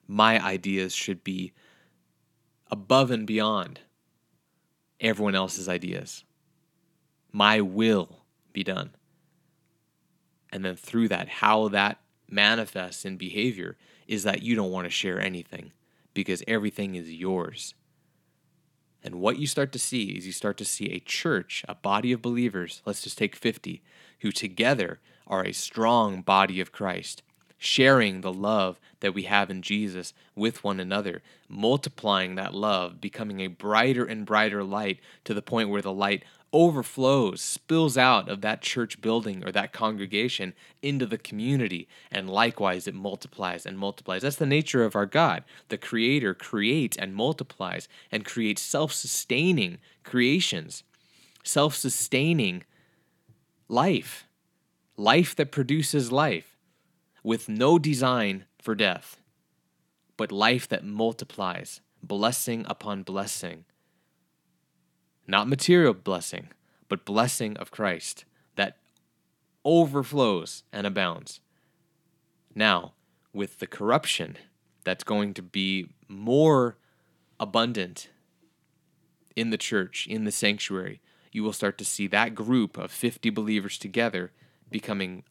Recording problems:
none

